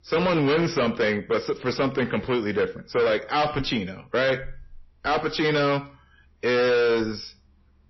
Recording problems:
distortion; heavy; 8 dB below the speech
garbled, watery; slightly; nothing above 5.5 kHz

